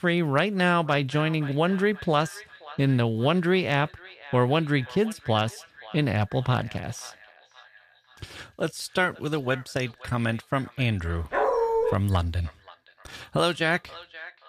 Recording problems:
echo of what is said; faint; throughout; 530 ms later, 20 dB below the speech
dog barking; loud; at 11 s; peak 2 dB above the speech

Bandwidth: 14.5 kHz